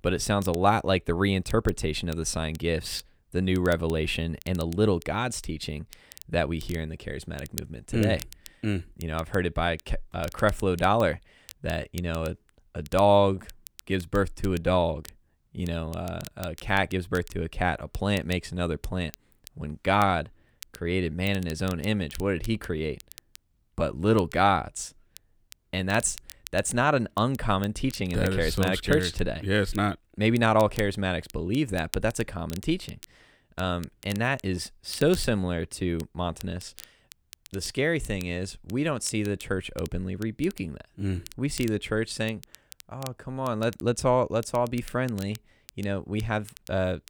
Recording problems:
crackle, like an old record; noticeable; 20 dB below the speech

